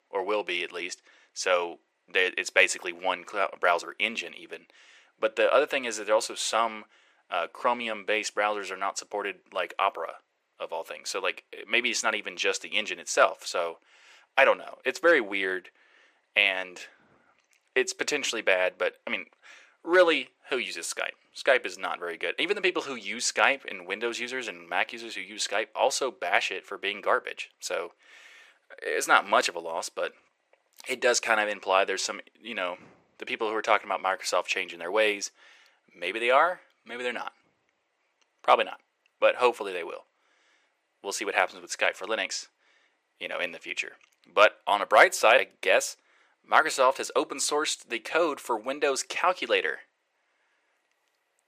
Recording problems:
thin; very; fading below 500 Hz

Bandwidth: 15 kHz